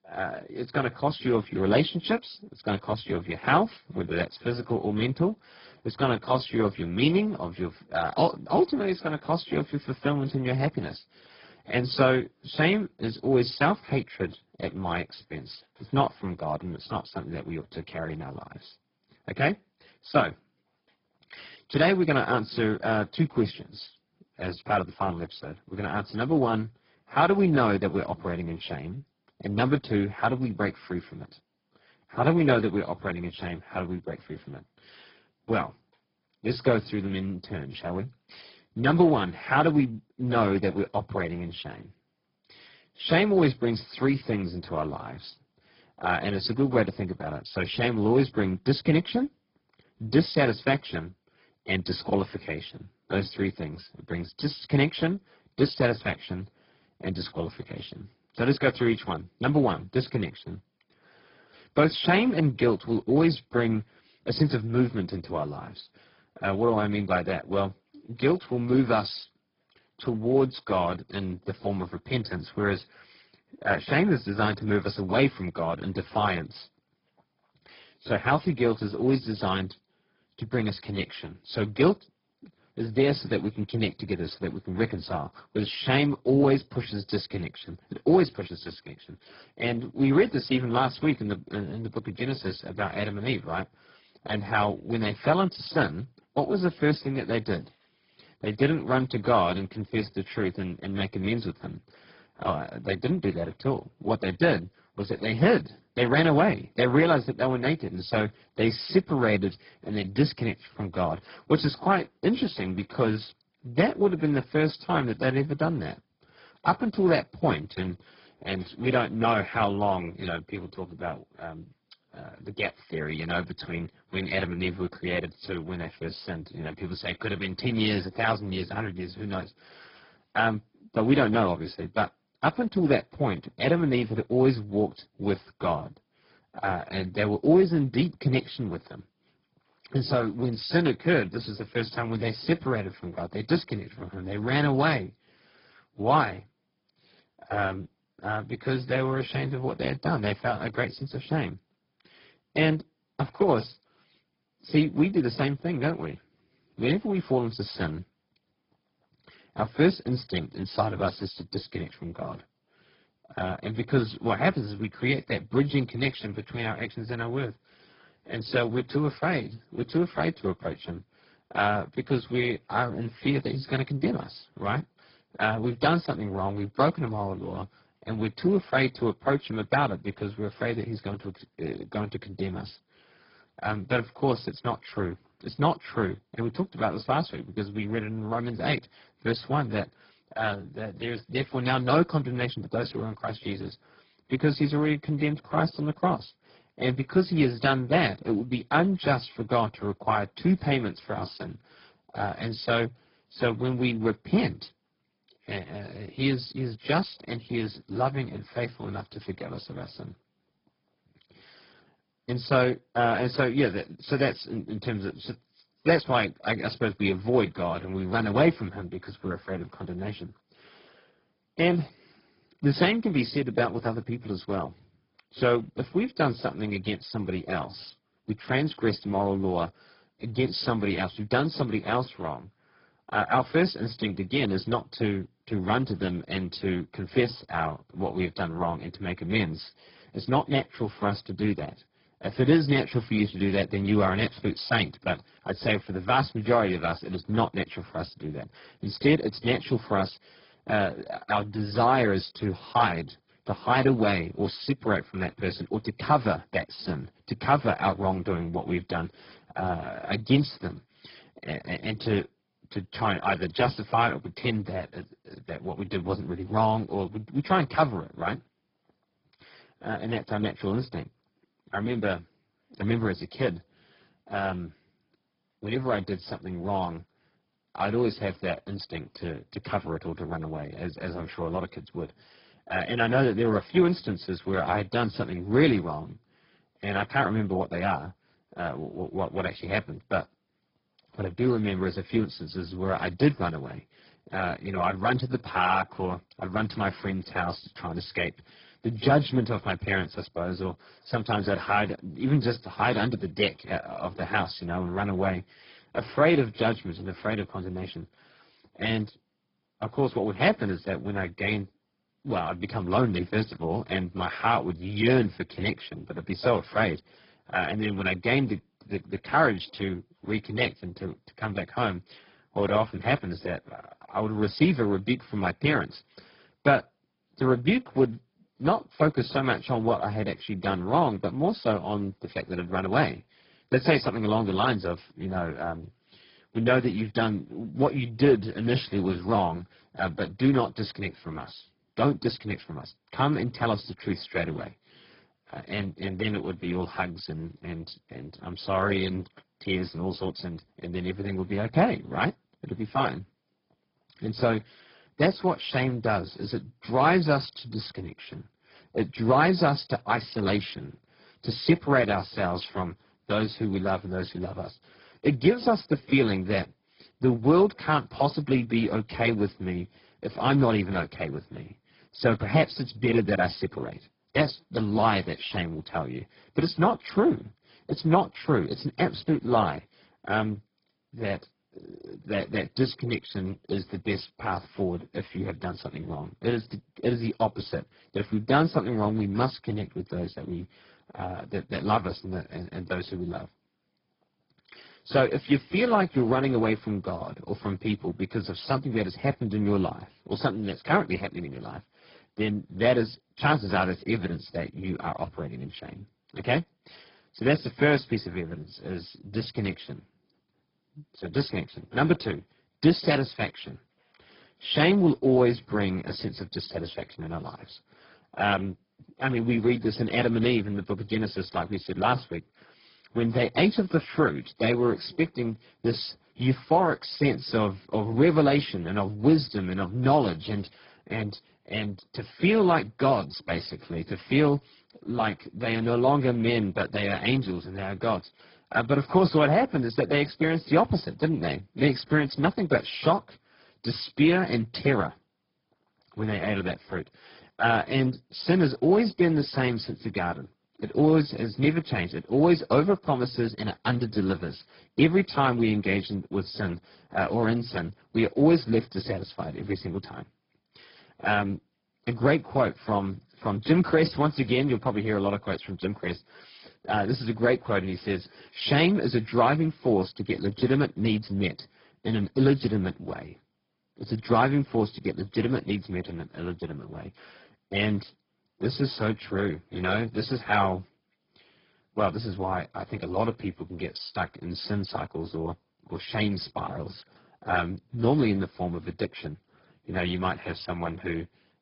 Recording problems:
garbled, watery; badly; nothing above 5 kHz
high frequencies cut off; slight

